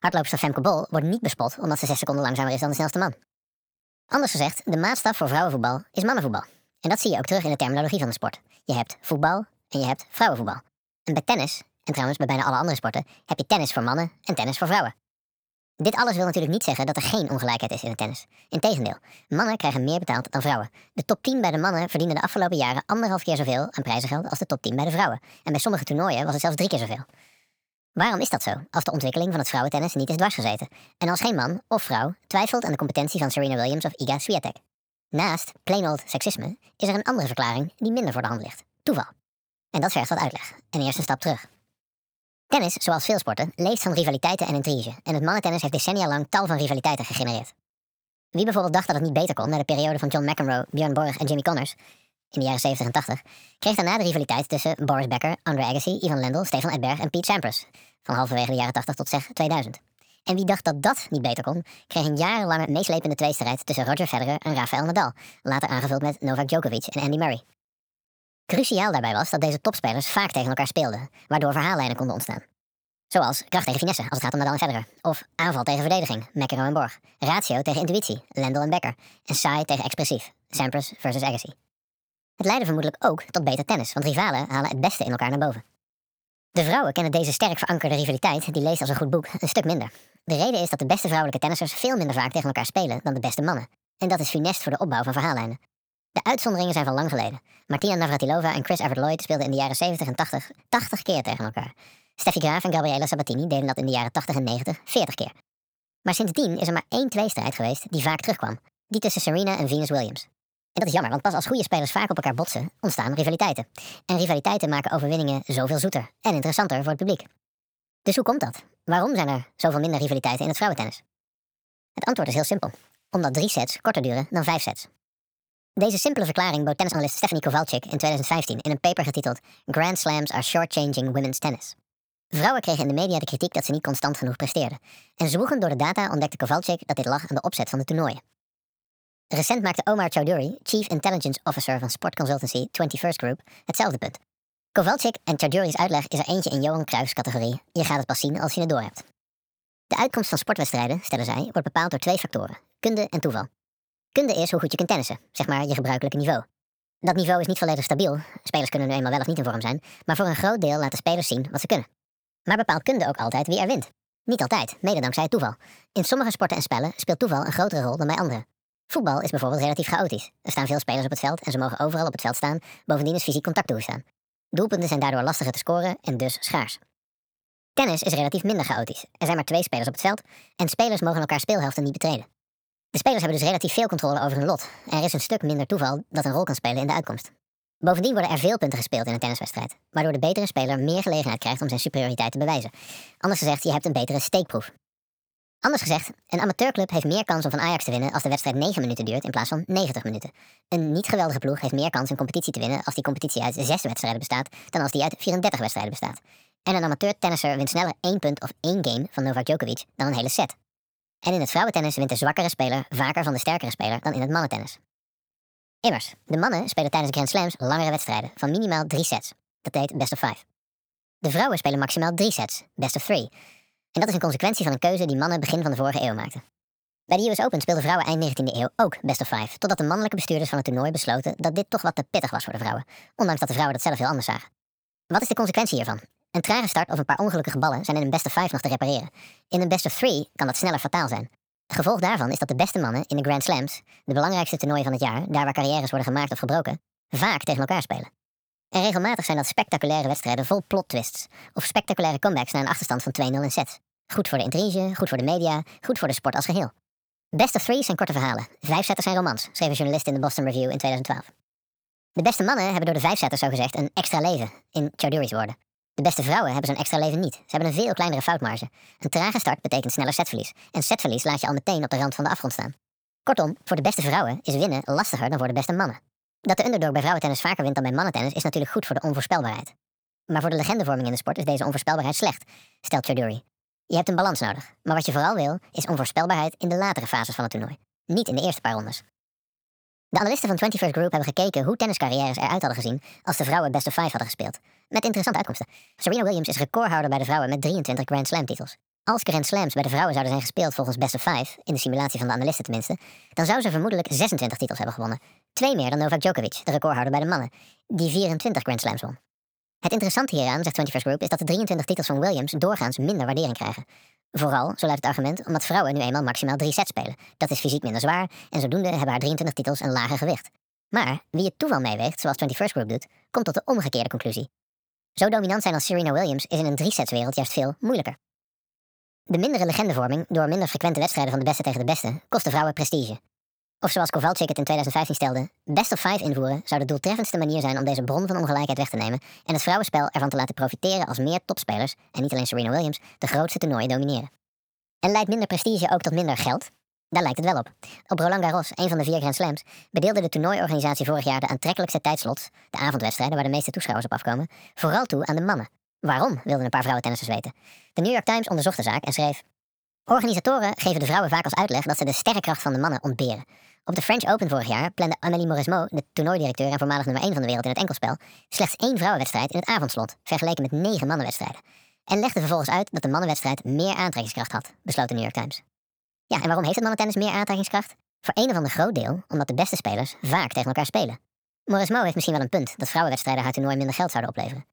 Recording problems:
wrong speed and pitch; too fast and too high; 1.5 times normal speed
uneven, jittery; strongly; from 21 s to 6:17

